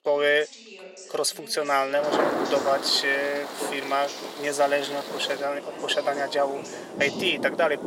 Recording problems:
thin; somewhat; fading below 400 Hz
rain or running water; loud; from 2 s on; 7 dB below the speech
voice in the background; noticeable; throughout; 15 dB below the speech

